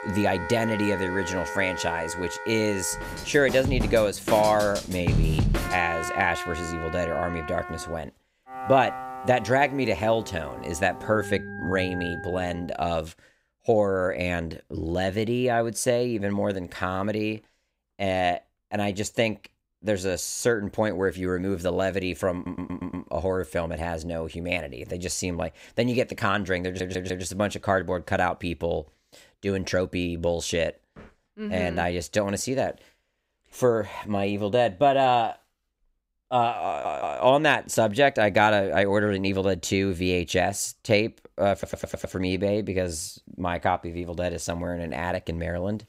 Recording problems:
background music; loud; until 12 s; 7 dB below the speech
audio stuttering; 4 times, first at 22 s

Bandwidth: 15.5 kHz